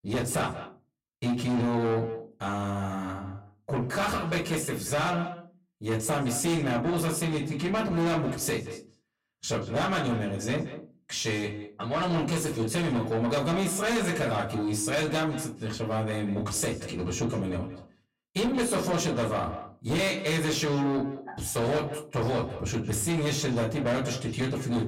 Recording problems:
distortion; heavy; 7 dB below the speech
off-mic speech; far
echo of what is said; noticeable; throughout; 180 ms later, 10 dB below the speech
room echo; very slight; dies away in 0.2 s

